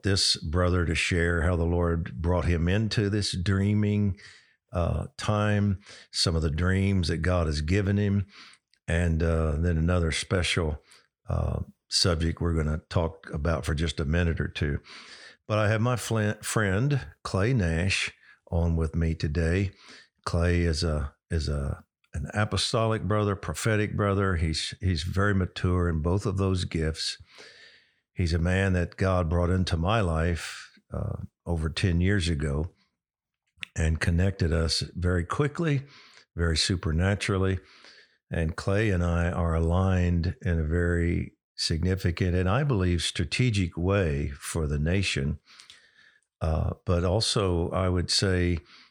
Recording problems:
none

